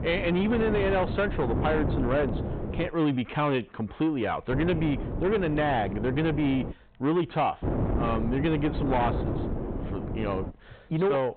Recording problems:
high frequencies cut off; severe; nothing above 4 kHz
distortion; slight; 10 dB below the speech
wind noise on the microphone; heavy; until 3 s, from 4.5 to 6.5 s and from 7.5 to 11 s; 8 dB below the speech

